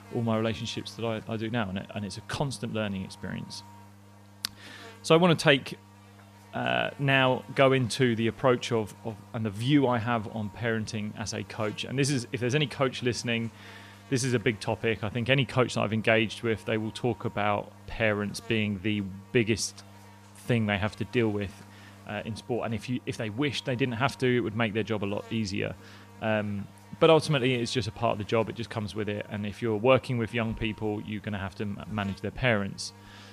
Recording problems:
electrical hum; faint; throughout; 50 Hz, 25 dB below the speech

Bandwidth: 15 kHz